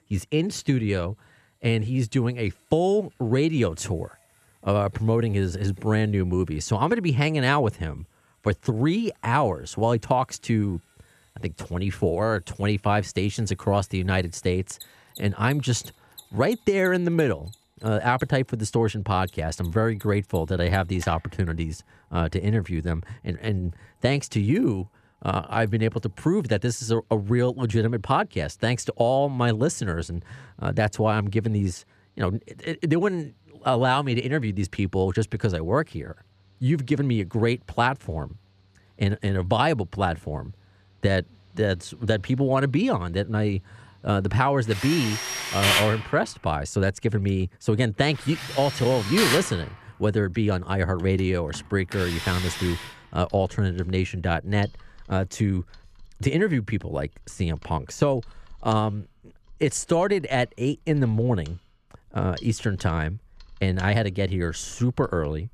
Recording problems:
machinery noise; loud; throughout; 6 dB below the speech

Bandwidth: 14.5 kHz